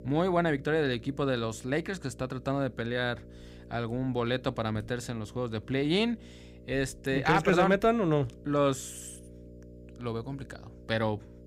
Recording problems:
electrical hum; faint; throughout; 60 Hz, 25 dB below the speech

